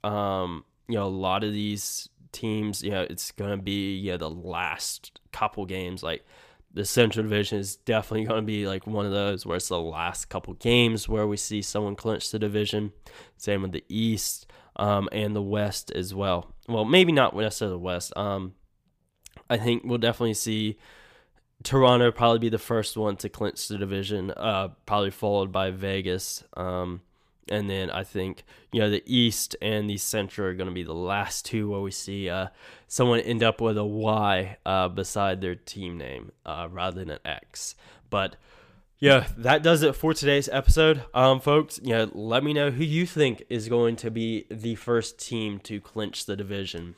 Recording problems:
none

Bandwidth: 15 kHz